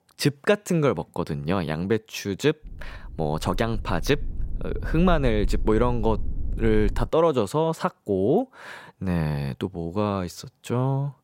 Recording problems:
low rumble; faint; from 2.5 to 7 s; 25 dB below the speech

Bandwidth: 16 kHz